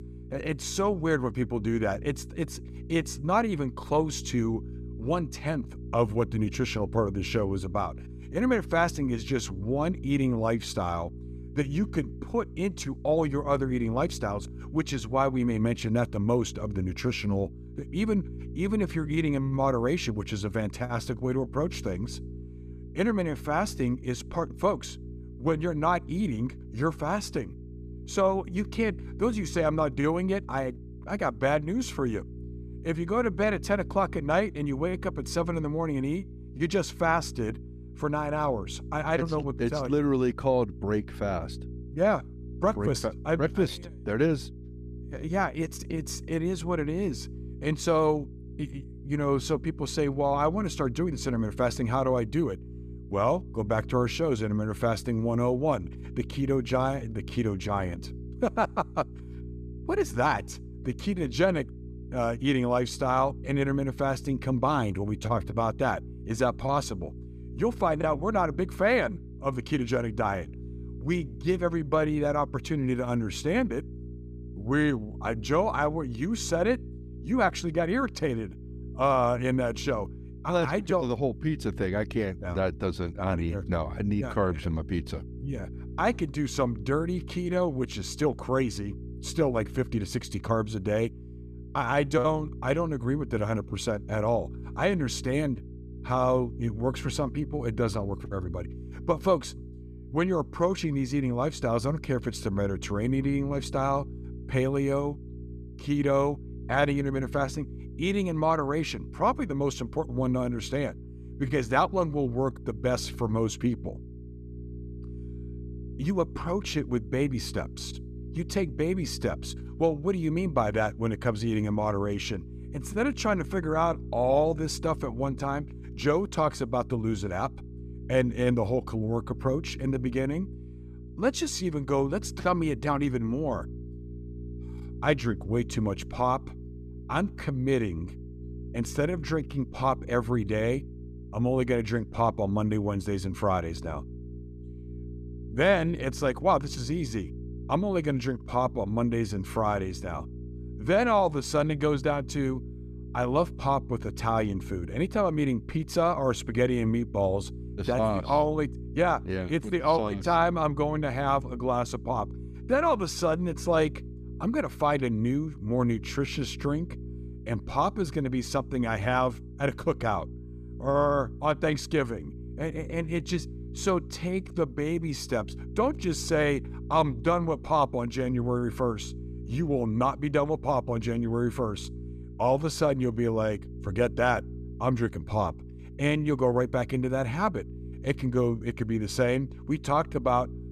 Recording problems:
electrical hum; faint; throughout; 60 Hz, 20 dB below the speech

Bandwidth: 14.5 kHz